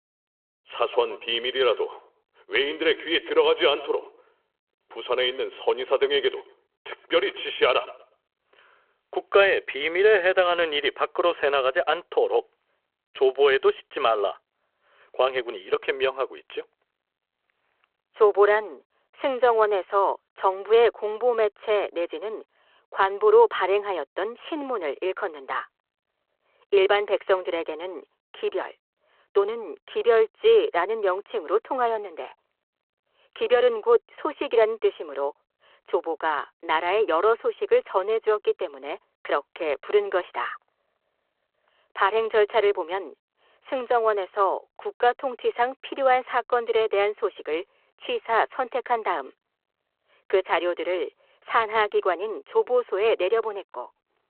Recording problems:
phone-call audio

